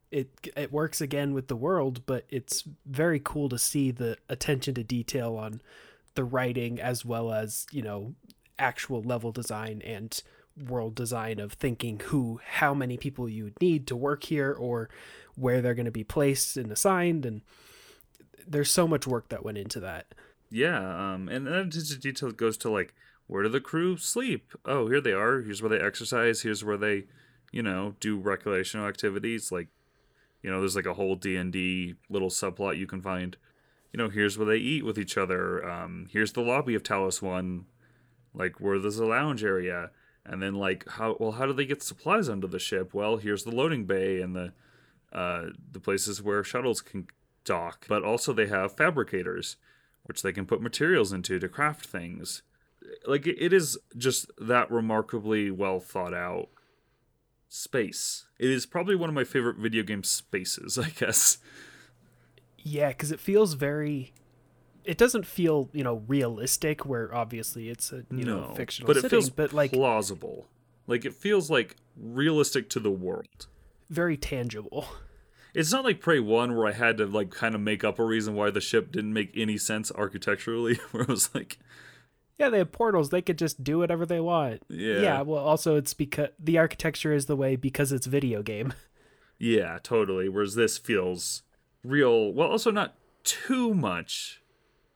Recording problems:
none

